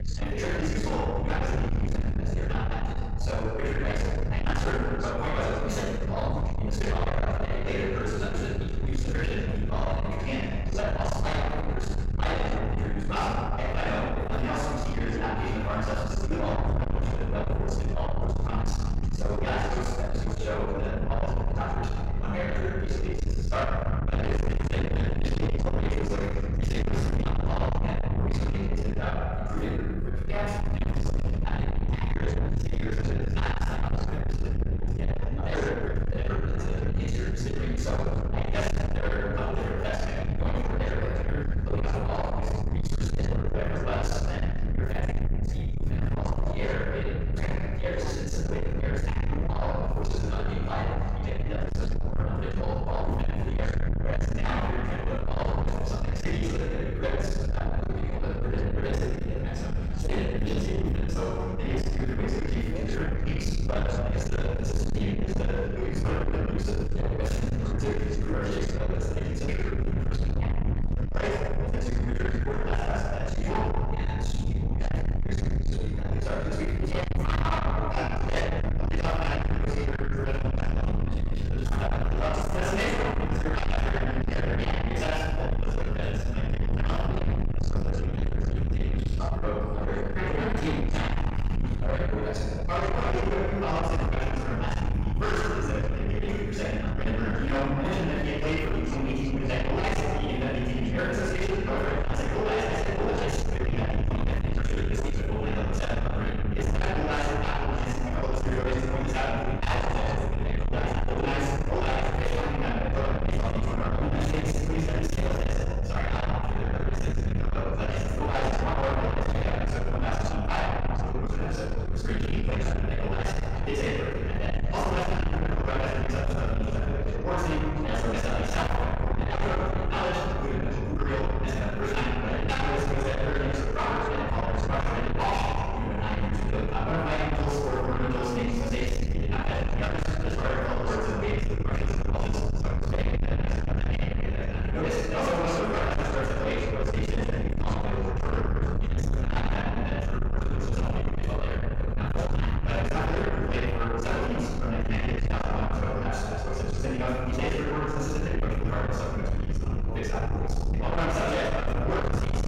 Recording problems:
distortion; heavy; 6 dB below the speech
room echo; strong; dies away in 1.5 s
off-mic speech; far
wrong speed, natural pitch; too fast; 1.7 times normal speed
low rumble; loud; throughout; 7 dB below the speech
background chatter; noticeable; throughout; 2 voices, 15 dB below the speech

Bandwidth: 16 kHz